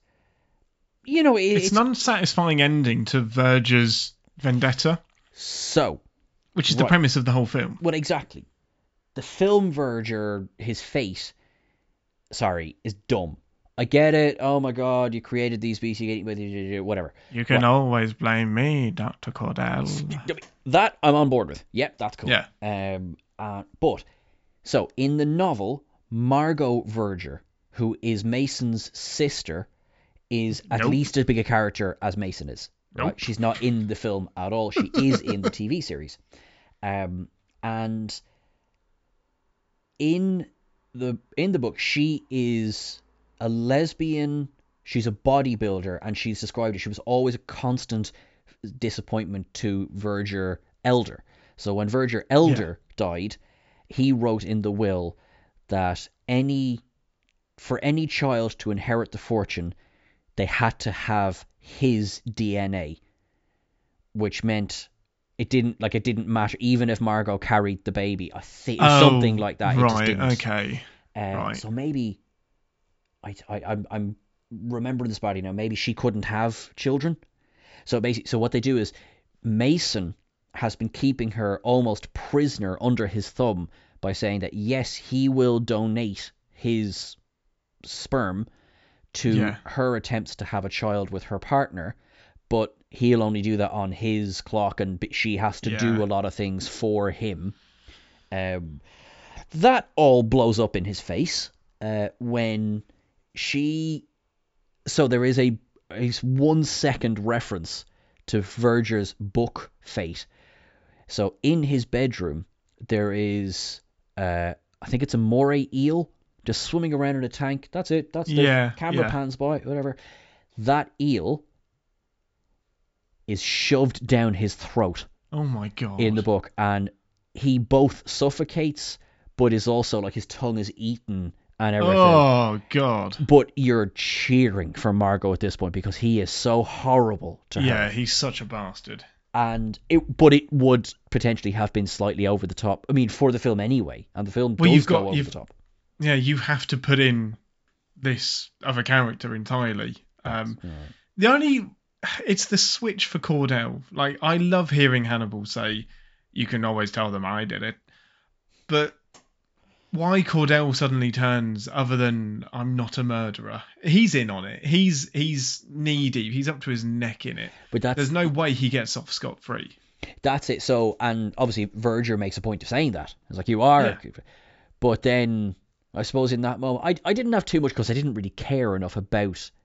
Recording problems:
high frequencies cut off; noticeable; nothing above 8 kHz

